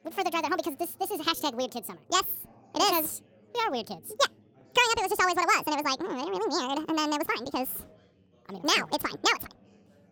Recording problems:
wrong speed and pitch; too fast and too high; 1.7 times normal speed
background chatter; faint; throughout; 4 voices, 30 dB below the speech

